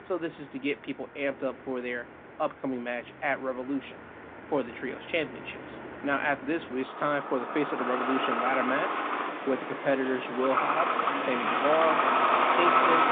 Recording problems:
phone-call audio
traffic noise; very loud; throughout; 4 dB above the speech

